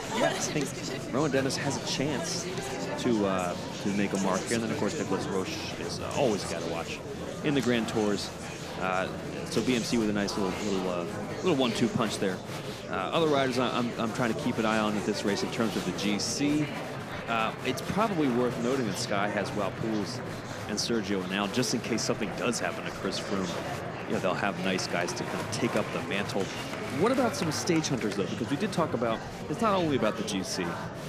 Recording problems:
murmuring crowd; loud; throughout; 5 dB below the speech

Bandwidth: 14.5 kHz